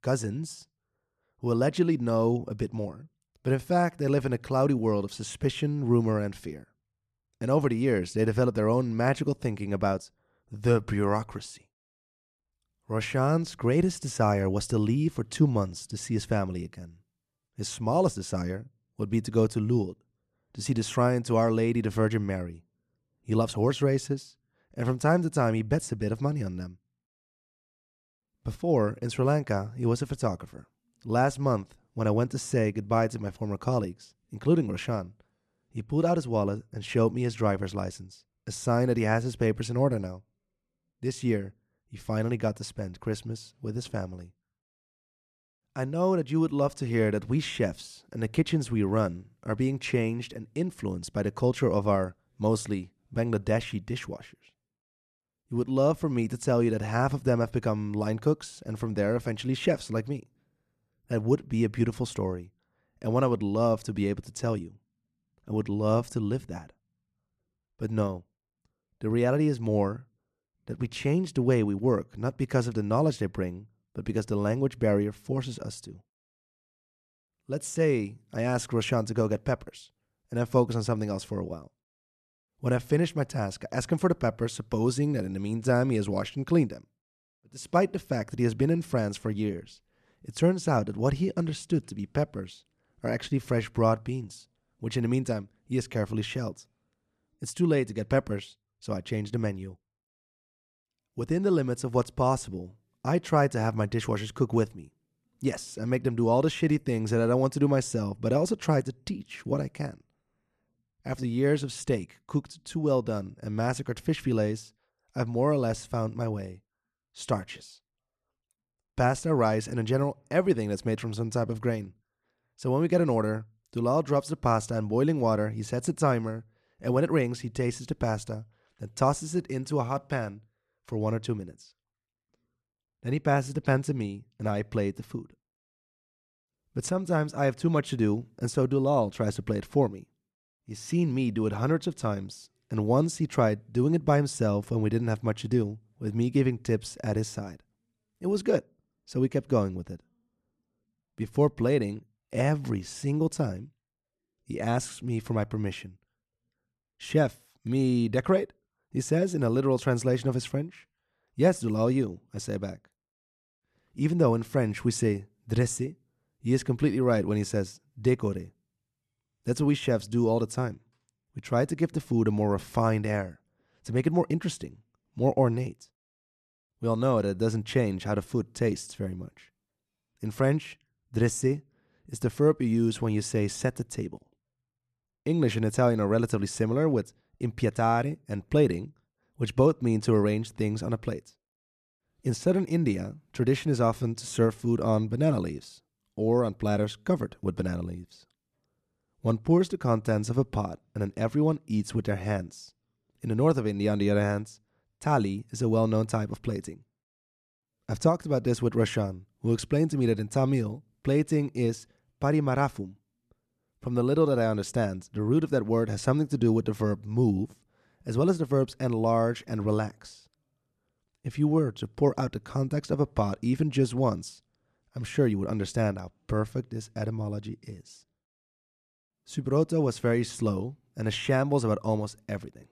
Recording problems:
none

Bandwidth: 13.5 kHz